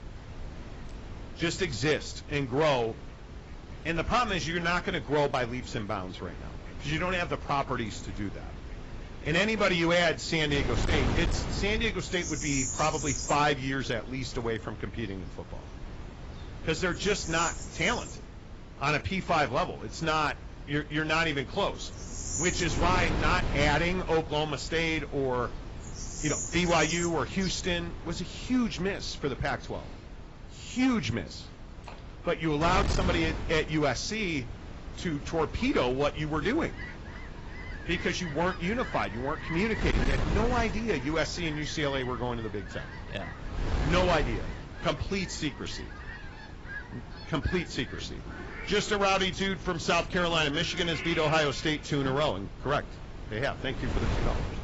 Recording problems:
garbled, watery; badly; nothing above 7.5 kHz
distortion; slight; 4% of the sound clipped
animal sounds; noticeable; throughout; 10 dB below the speech
wind noise on the microphone; occasional gusts; 15 dB below the speech

